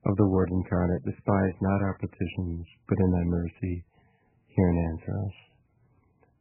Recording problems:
garbled, watery; badly; nothing above 3 kHz

